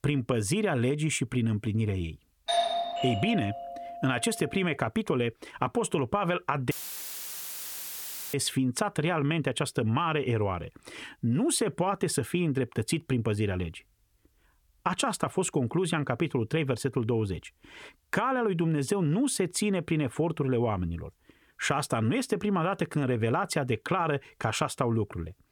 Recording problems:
doorbell; loud; from 2.5 to 4 s; peak 2 dB above the speech
audio cutting out; filled with static; at 6.5 s for 1.5 s

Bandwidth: 18.5 kHz